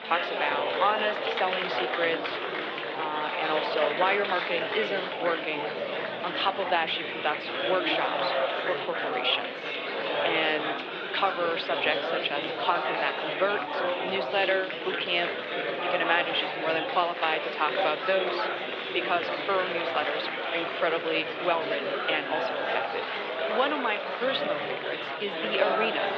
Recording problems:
thin; very; fading below 550 Hz
muffled; slightly; fading above 3.5 kHz
murmuring crowd; loud; throughout; as loud as the speech

